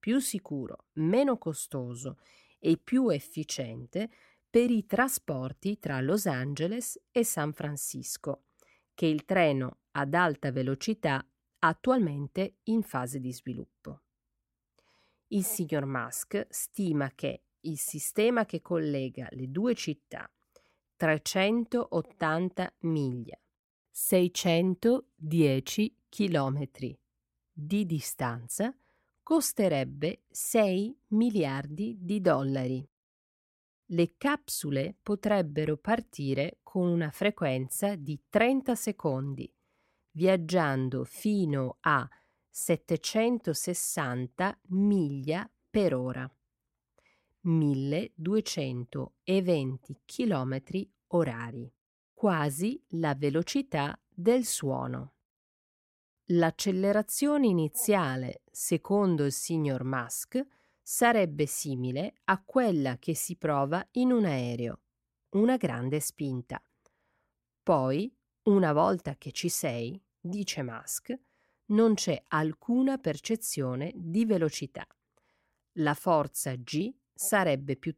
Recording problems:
none

